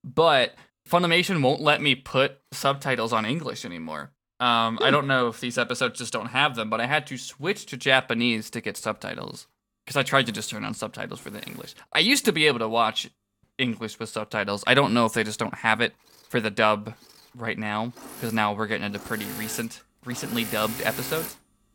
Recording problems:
machinery noise; noticeable; throughout; 15 dB below the speech

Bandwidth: 18 kHz